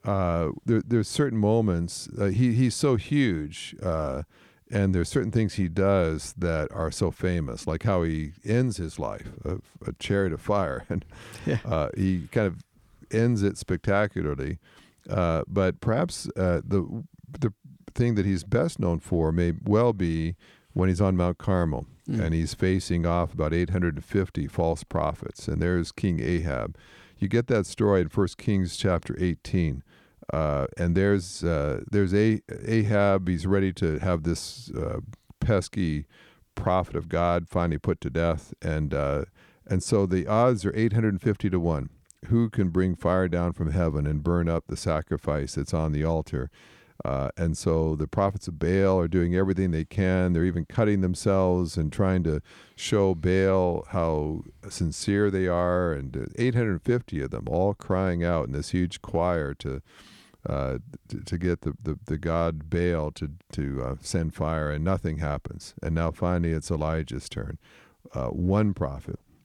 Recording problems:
none

